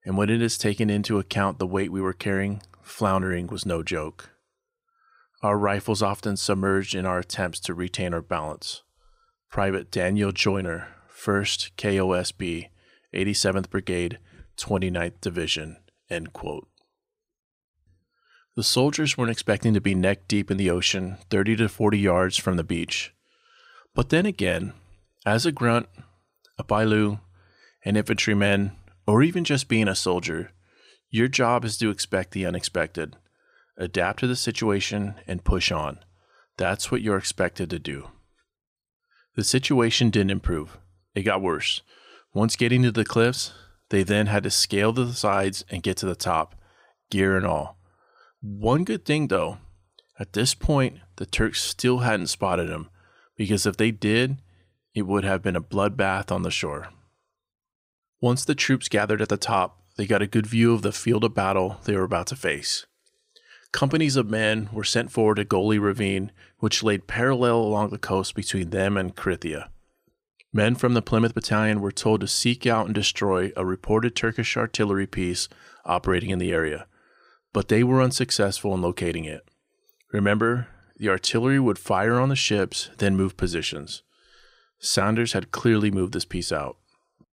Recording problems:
none

